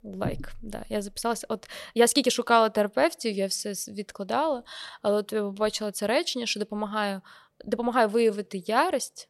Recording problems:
uneven, jittery; strongly; from 1 to 8.5 s

